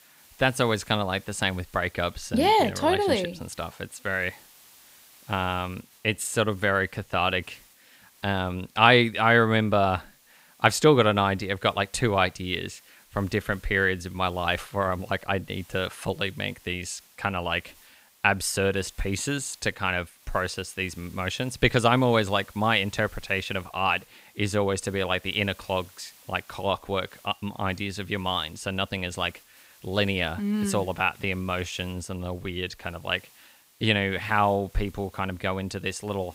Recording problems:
hiss; faint; throughout; 25 dB below the speech

